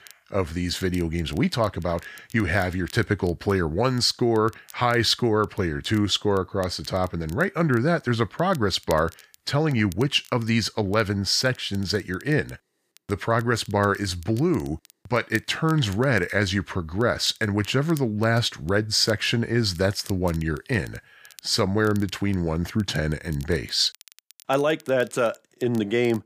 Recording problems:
crackle, like an old record; faint; 25 dB below the speech

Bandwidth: 15 kHz